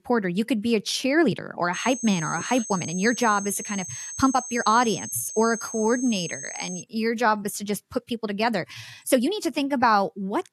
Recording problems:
high-pitched whine; loud; from 1.5 to 7 s; 6.5 kHz, 9 dB below the speech
uneven, jittery; strongly; from 1 to 10 s

